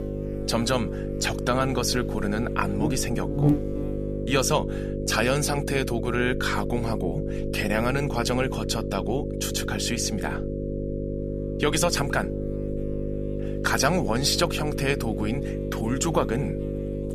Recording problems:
electrical hum; loud; throughout; 50 Hz, 7 dB below the speech

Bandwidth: 14.5 kHz